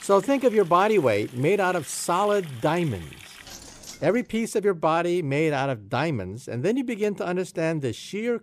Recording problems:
household noises; noticeable; until 4 s; 20 dB below the speech

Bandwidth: 14.5 kHz